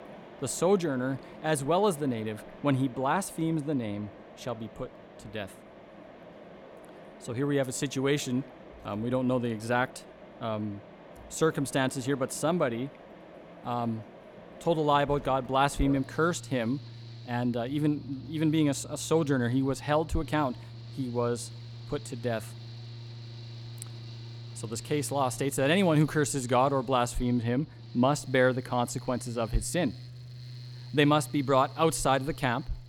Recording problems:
machinery noise; noticeable; throughout; 15 dB below the speech

